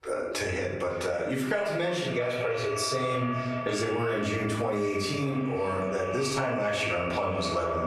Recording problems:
echo of what is said; strong; throughout; 550 ms later, 7 dB below the speech
off-mic speech; far
squashed, flat; heavily
room echo; noticeable; dies away in 0.6 s

